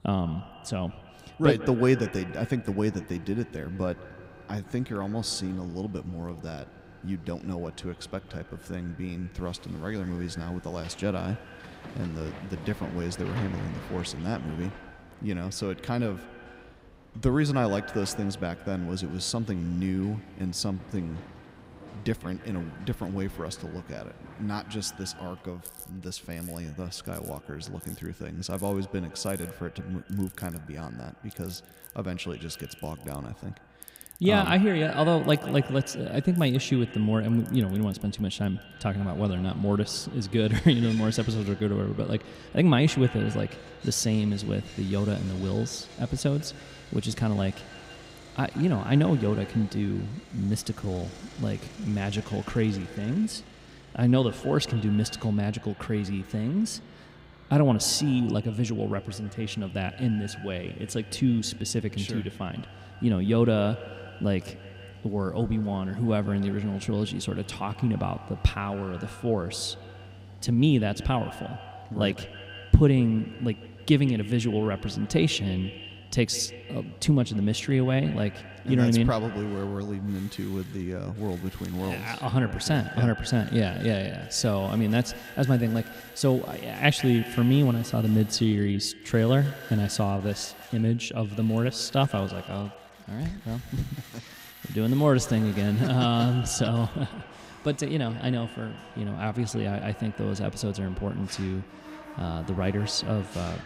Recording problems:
echo of what is said; noticeable; throughout; 150 ms later, 15 dB below the speech
machinery noise; faint; throughout; 20 dB below the speech

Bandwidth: 15.5 kHz